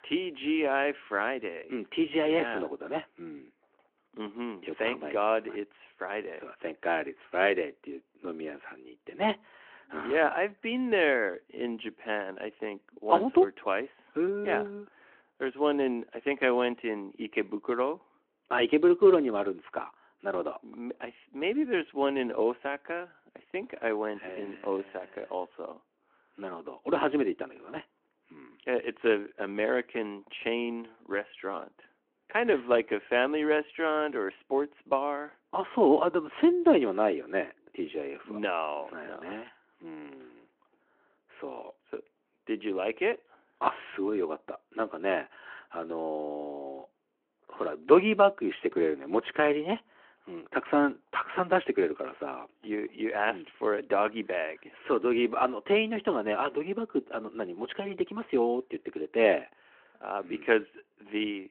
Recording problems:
phone-call audio

